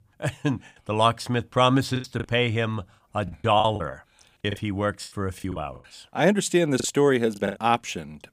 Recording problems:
choppy; very; 10% of the speech affected

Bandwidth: 15 kHz